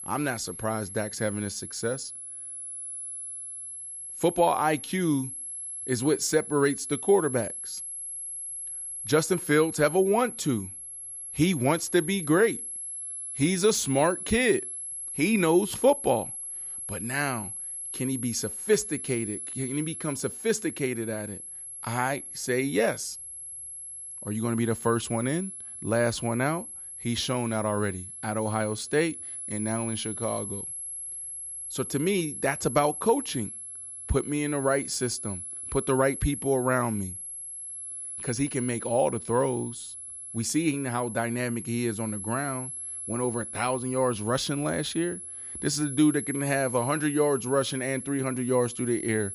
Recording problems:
high-pitched whine; loud; throughout; 11 kHz, 8 dB below the speech

